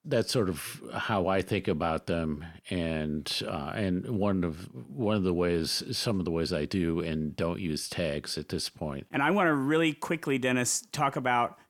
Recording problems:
none

